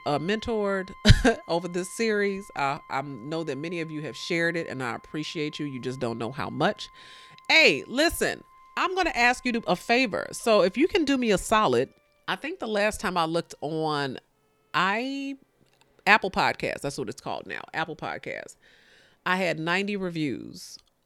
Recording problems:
background music; faint; throughout; 25 dB below the speech

